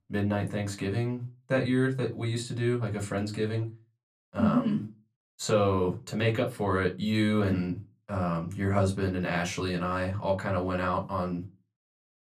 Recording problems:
room echo; very slight; dies away in 0.2 s
off-mic speech; somewhat distant

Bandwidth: 14.5 kHz